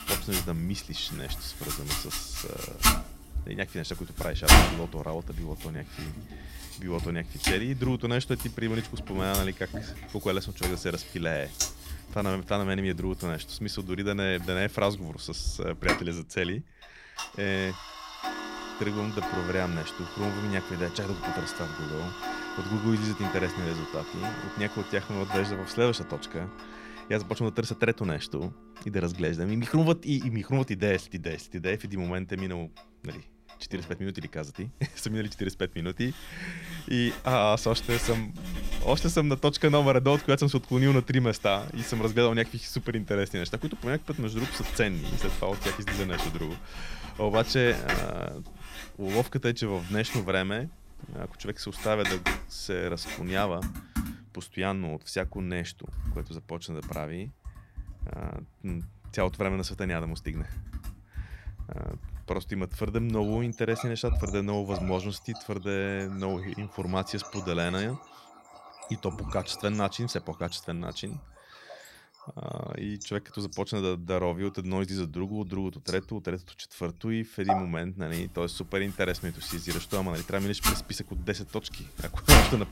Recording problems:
household noises; loud; throughout; 3 dB below the speech

